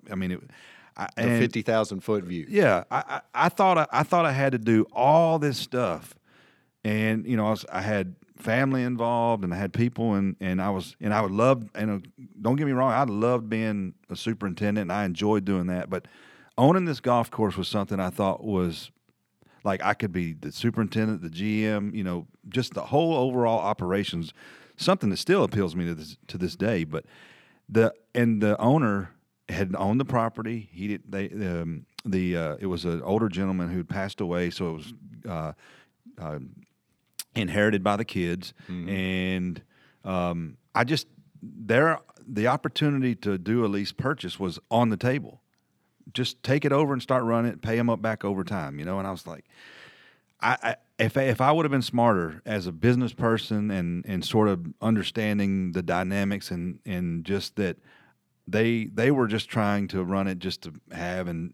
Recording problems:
none

